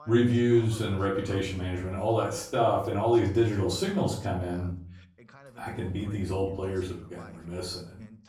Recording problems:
off-mic speech; far
room echo; slight; dies away in 0.4 s
voice in the background; faint; throughout; 25 dB below the speech

